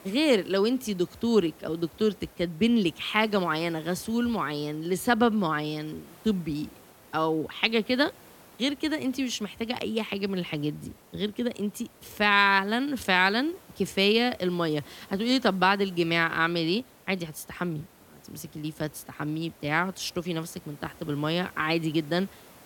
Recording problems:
hiss; faint; throughout; 25 dB below the speech

